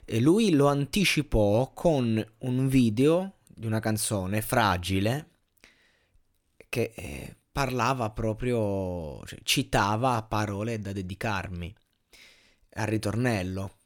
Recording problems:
none

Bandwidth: 18 kHz